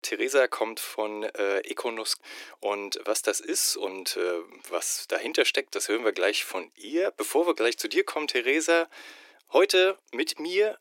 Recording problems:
thin; very; fading below 350 Hz

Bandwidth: 16 kHz